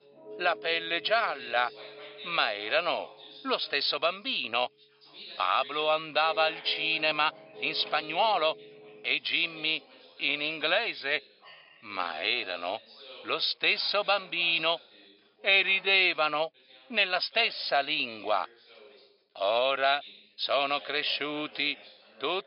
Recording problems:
thin; very; fading below 550 Hz
high frequencies cut off; noticeable; nothing above 5.5 kHz
background music; faint; throughout; 20 dB below the speech
background chatter; faint; throughout; 2 voices, 20 dB below the speech
uneven, jittery; strongly; from 0.5 to 21 s

